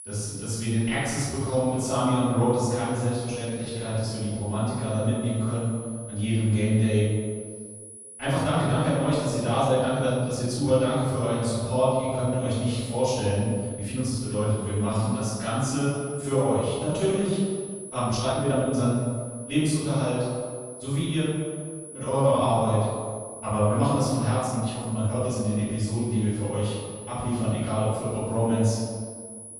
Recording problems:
room echo; strong; dies away in 1.7 s
off-mic speech; far
high-pitched whine; noticeable; throughout; 10.5 kHz, 15 dB below the speech
uneven, jittery; strongly; from 1.5 to 25 s

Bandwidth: 14.5 kHz